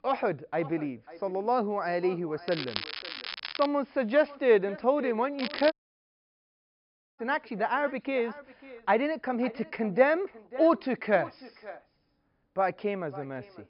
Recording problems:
high frequencies cut off; noticeable; nothing above 5.5 kHz
echo of what is said; faint; throughout; 540 ms later, 20 dB below the speech
crackling; loud; from 2.5 to 3.5 s and at 5.5 s; 8 dB below the speech
audio cutting out; at 5.5 s for 1.5 s

